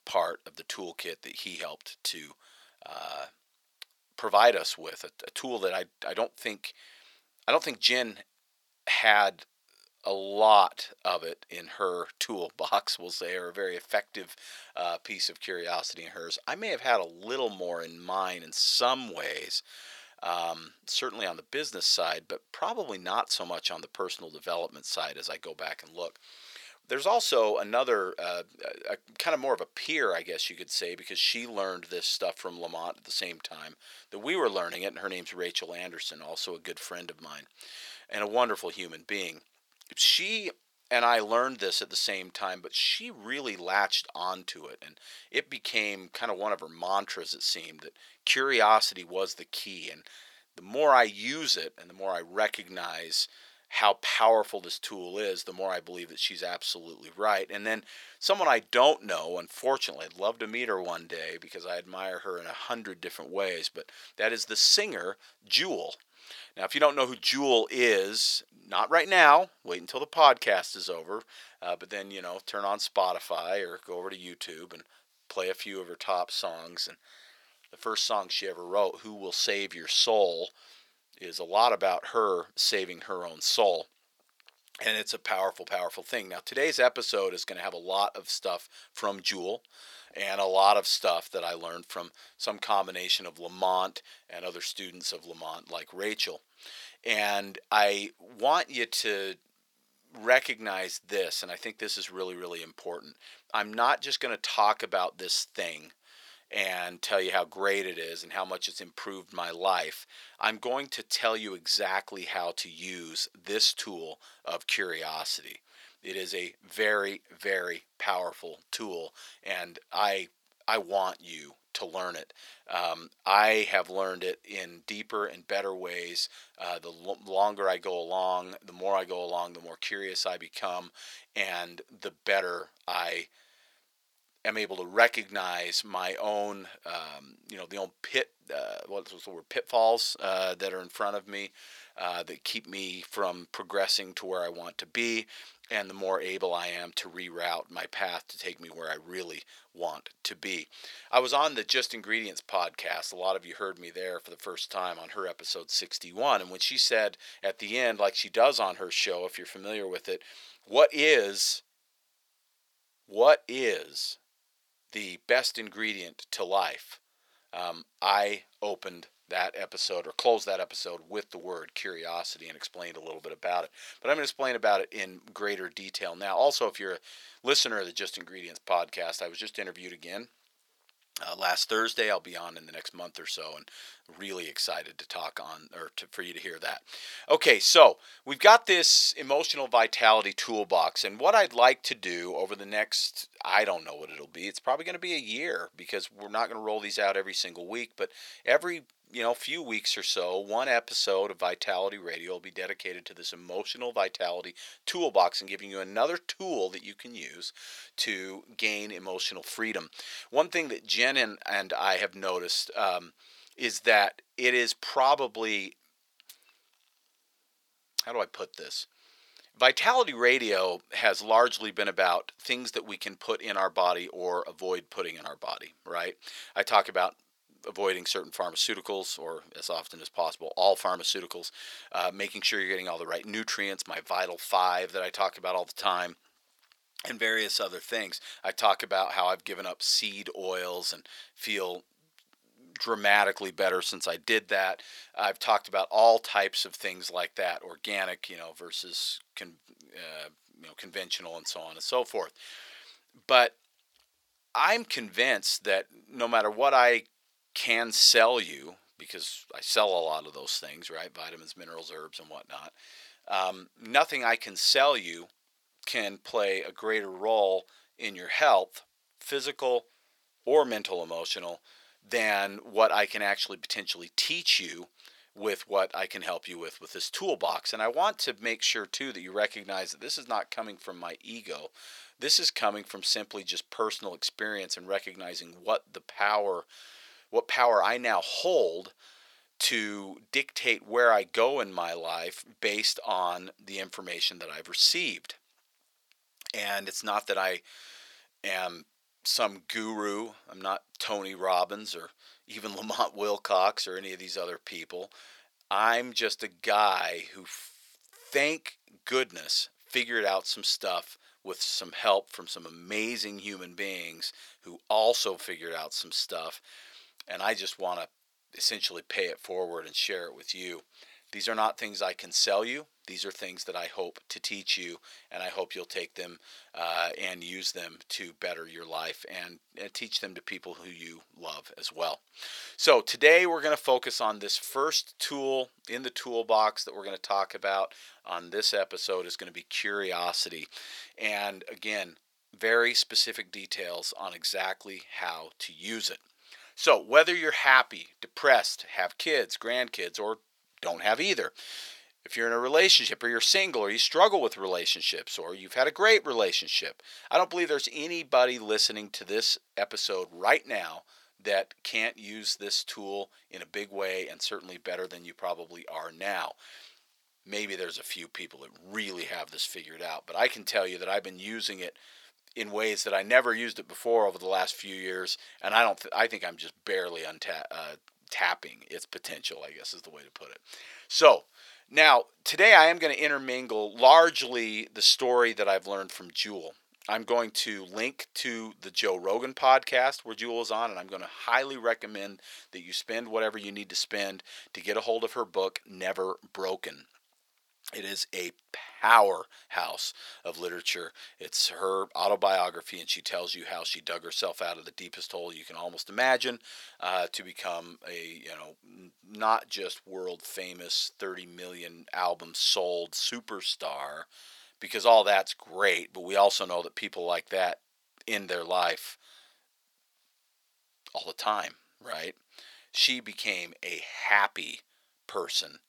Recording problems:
thin; very; fading below 700 Hz

